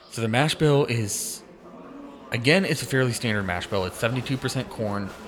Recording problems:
murmuring crowd; noticeable; throughout; 20 dB below the speech

